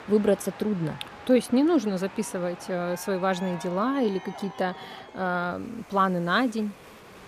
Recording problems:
train or aircraft noise; noticeable; throughout; 15 dB below the speech

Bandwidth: 14.5 kHz